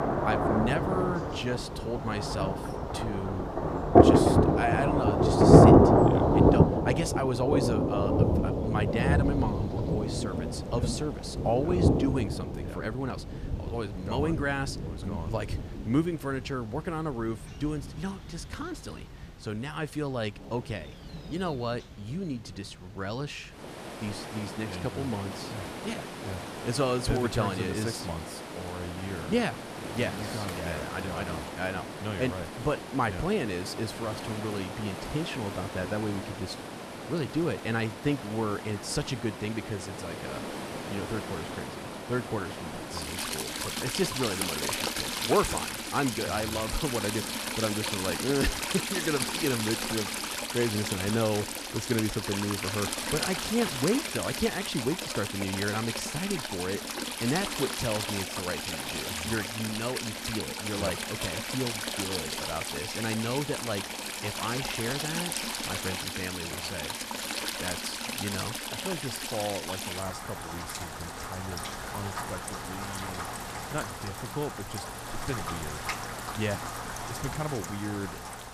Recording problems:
rain or running water; very loud; throughout; 3 dB above the speech

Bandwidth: 14.5 kHz